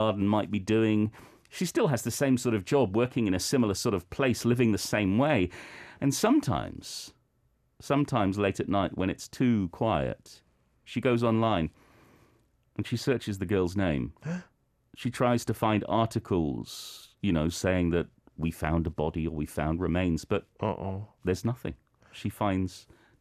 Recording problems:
abrupt cut into speech; at the start

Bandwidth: 14.5 kHz